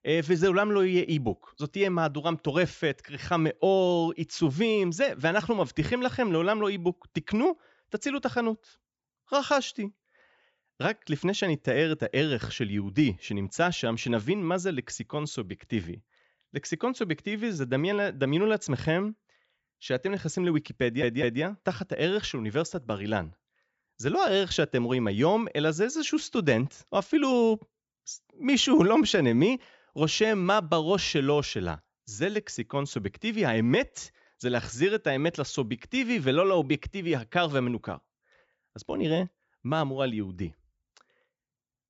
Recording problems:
high frequencies cut off; noticeable; nothing above 8 kHz
audio stuttering; at 21 s

